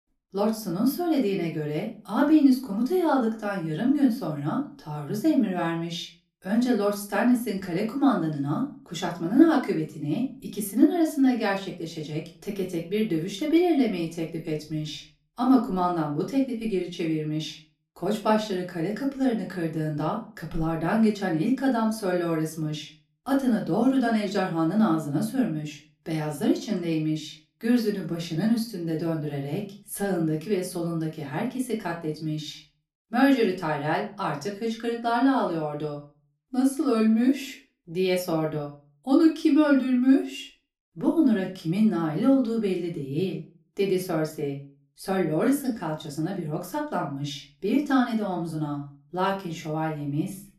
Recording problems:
room echo; slight; dies away in 0.3 s
off-mic speech; somewhat distant

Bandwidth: 14 kHz